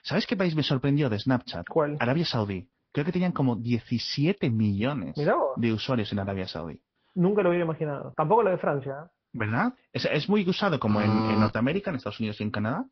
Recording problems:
high frequencies cut off; noticeable; nothing above 5.5 kHz
garbled, watery; slightly
alarm; noticeable; at 11 s; peak level with the speech

